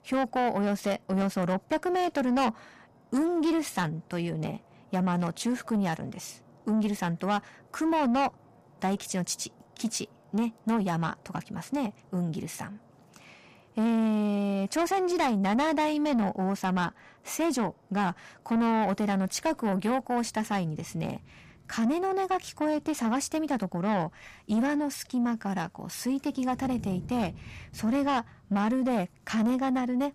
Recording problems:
distortion; slight; 10 dB below the speech
rain or running water; faint; throughout; 25 dB below the speech

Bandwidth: 15 kHz